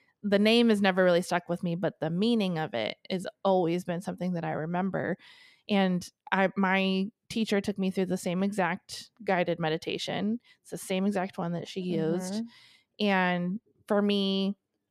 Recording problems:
none

